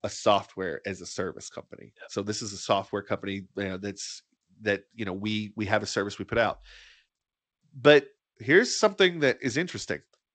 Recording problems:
garbled, watery; slightly; nothing above 8 kHz

